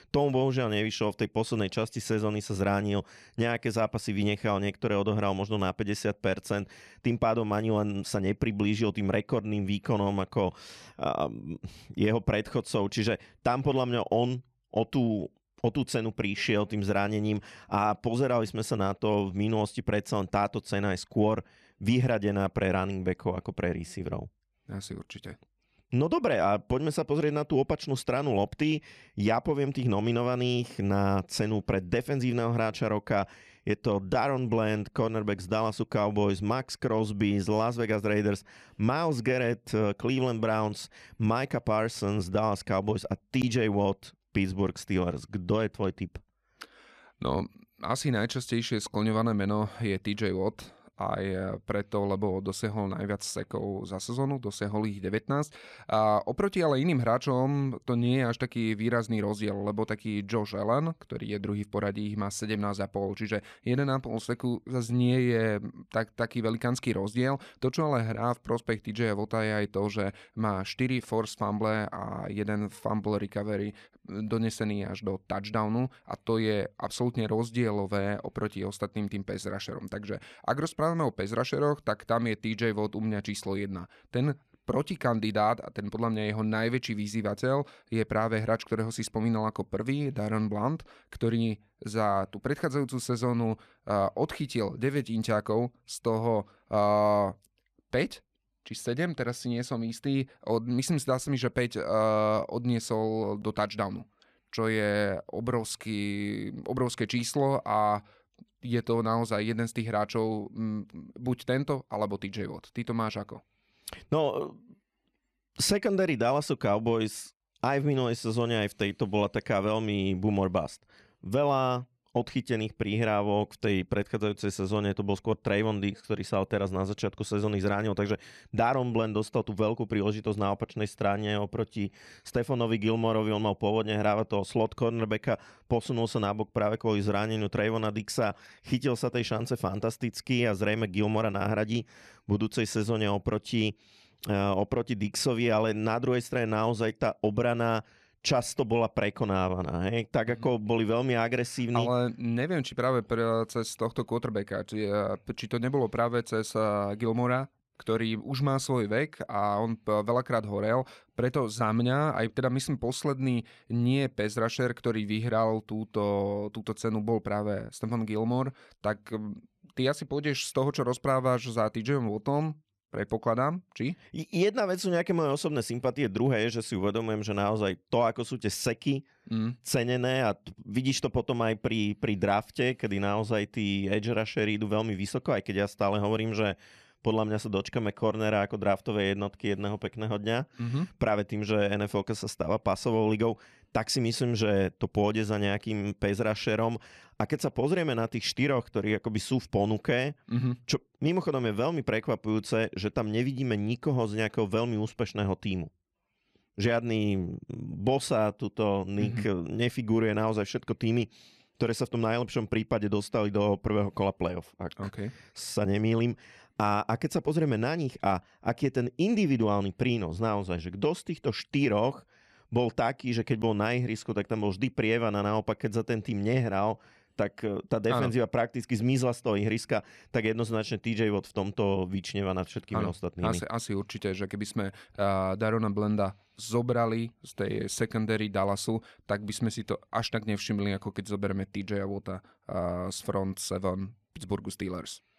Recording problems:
none

